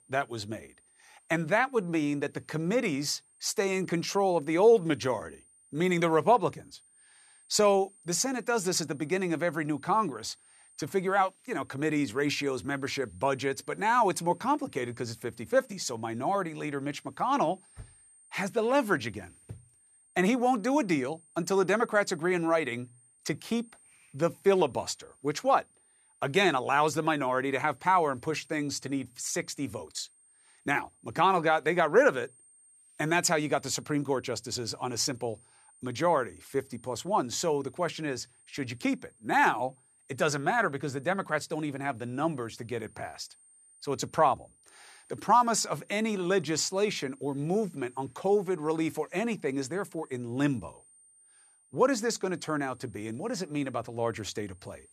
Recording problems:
high-pitched whine; faint; throughout; 8.5 kHz, 30 dB below the speech

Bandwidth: 14 kHz